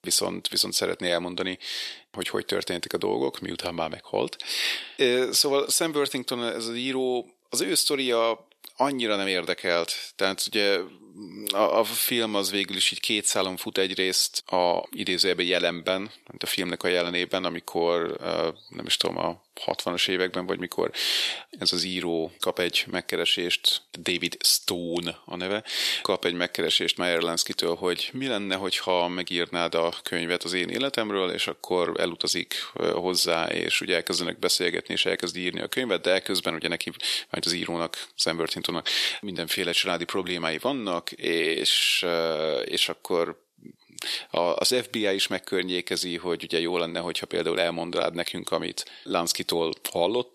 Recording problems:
thin; somewhat; fading below 450 Hz

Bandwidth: 13.5 kHz